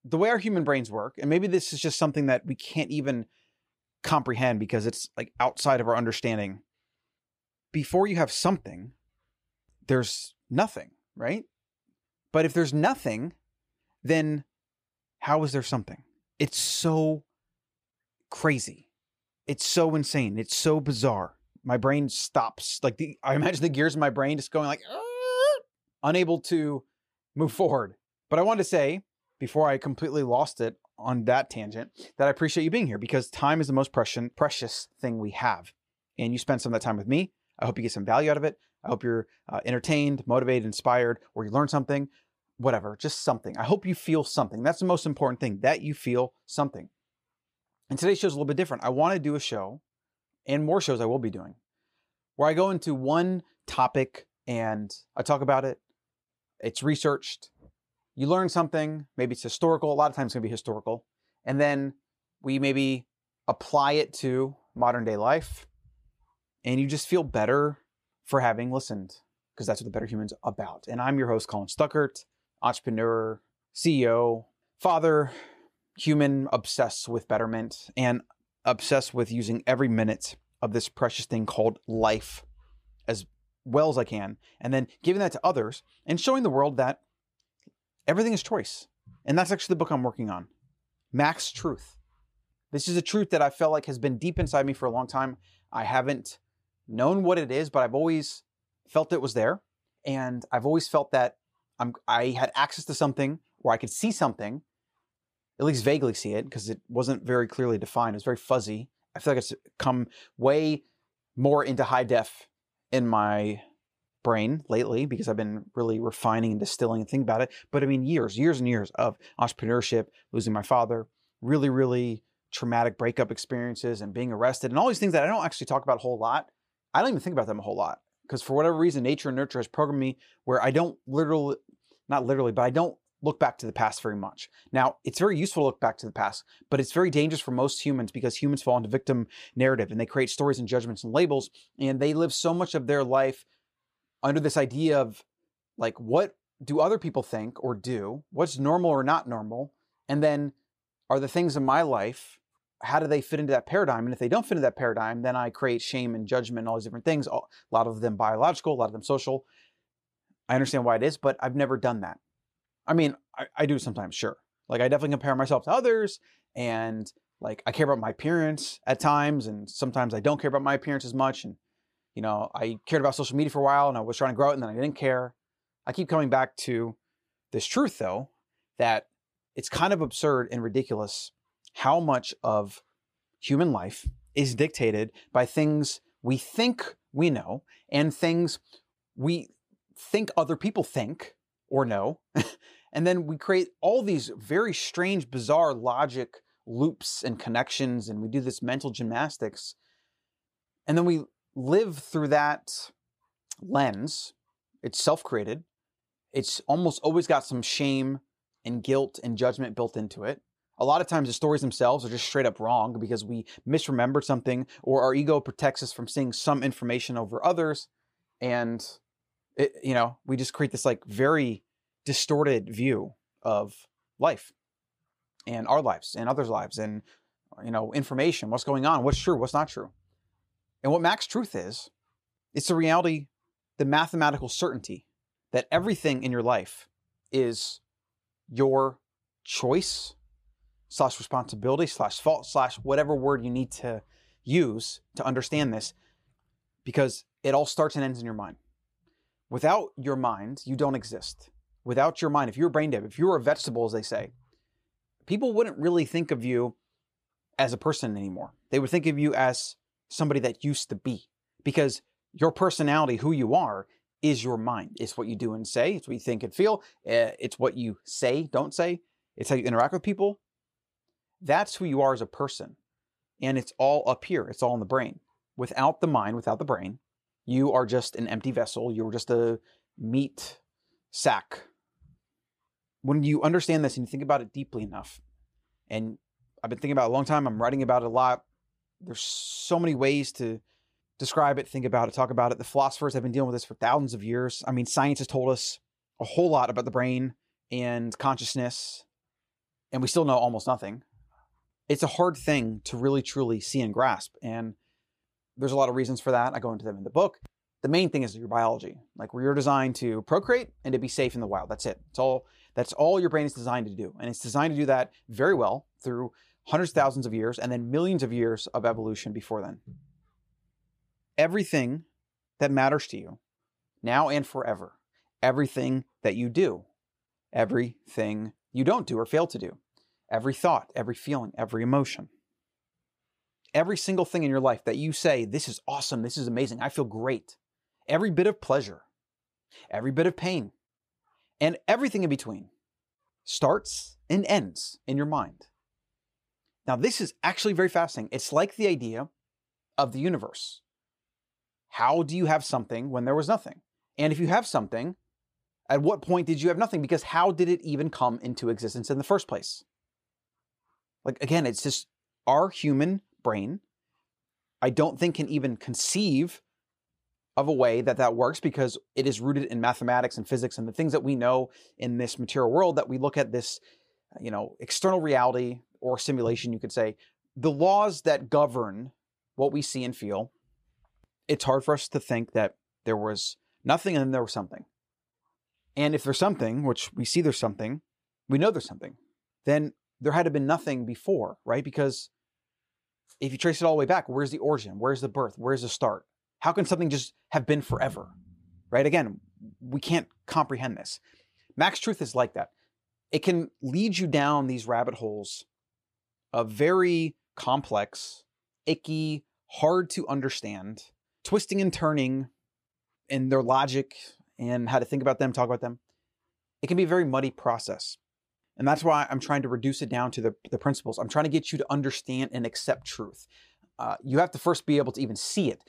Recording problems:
none

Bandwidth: 15 kHz